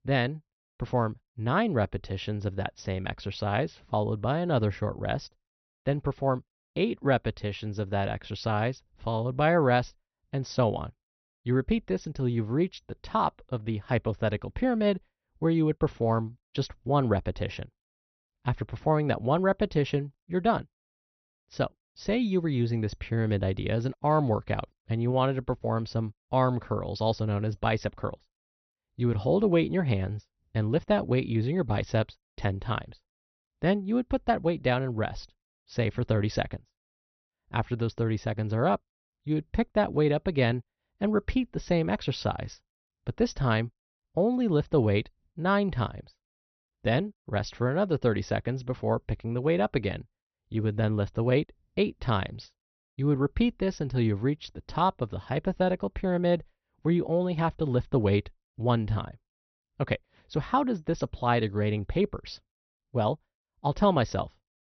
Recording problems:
high frequencies cut off; noticeable; nothing above 6 kHz

